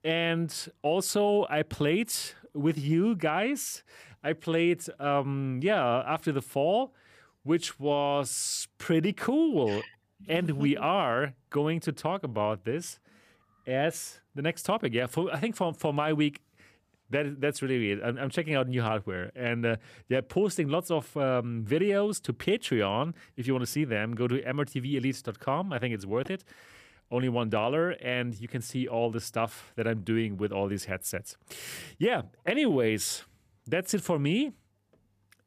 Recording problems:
none

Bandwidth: 15 kHz